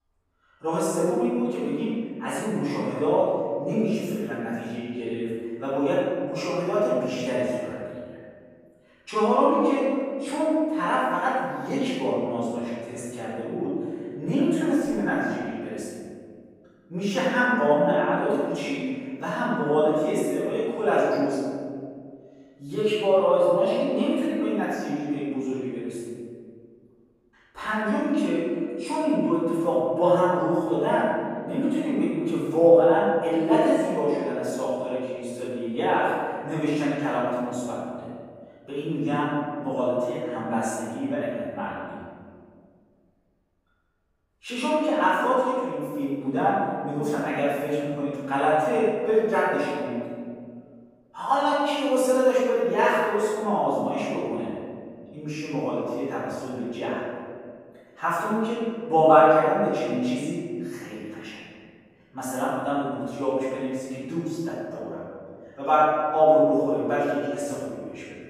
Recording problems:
room echo; strong; dies away in 2.1 s
off-mic speech; far

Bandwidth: 15.5 kHz